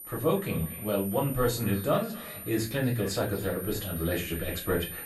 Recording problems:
off-mic speech; far
echo of what is said; faint; throughout; 240 ms later, 20 dB below the speech
room echo; very slight; dies away in 0.3 s
high-pitched whine; loud; throughout; 12 kHz, 10 dB below the speech
chatter from many people; faint; throughout; 30 dB below the speech

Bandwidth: 15 kHz